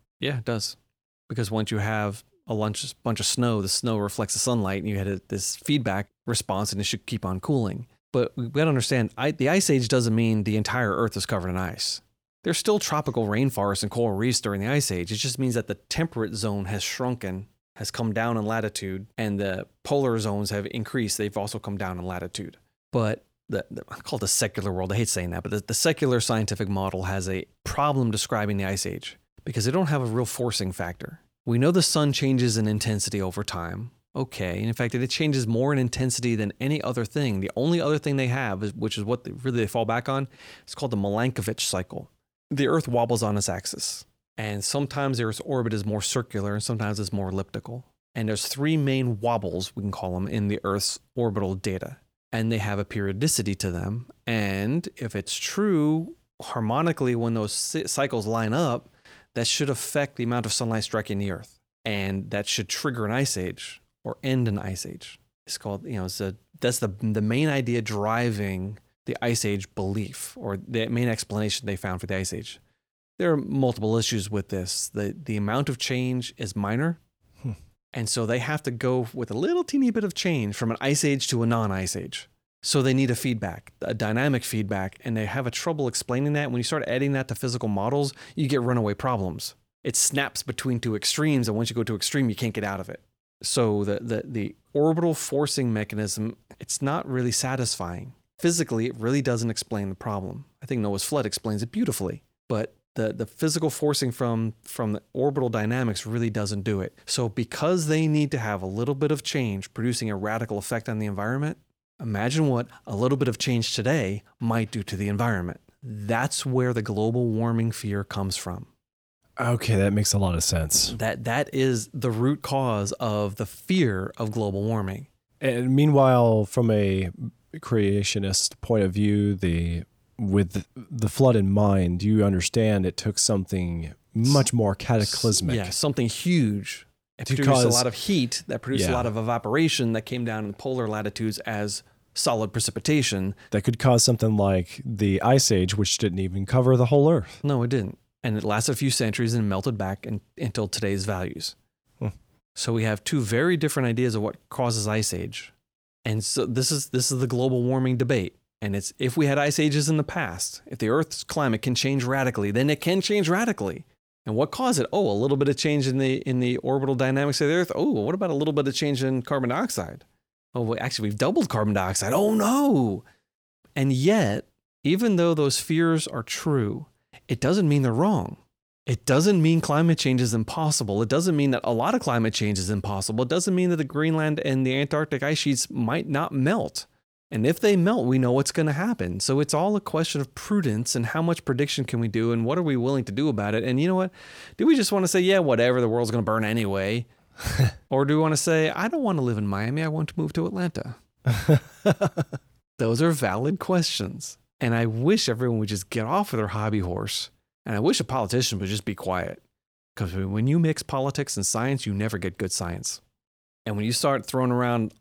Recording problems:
none

